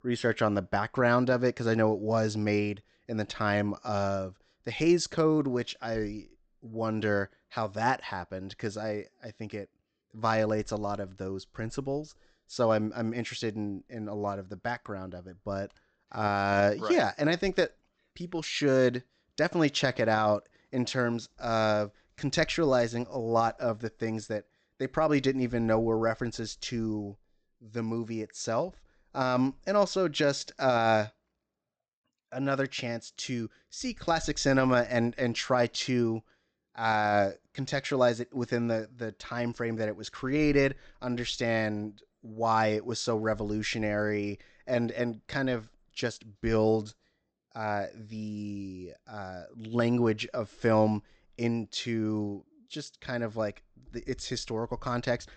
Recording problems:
high frequencies cut off; noticeable; nothing above 8 kHz

